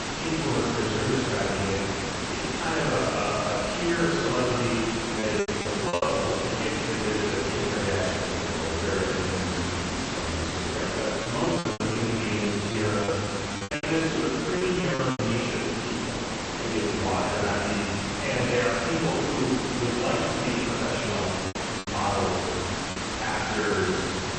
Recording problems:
room echo; strong; dies away in 1.8 s
off-mic speech; far
garbled, watery; slightly; nothing above 8 kHz
hiss; loud; throughout; 2 dB below the speech
choppy; very; at 5 s, from 11 to 15 s and from 22 to 24 s; 16% of the speech affected

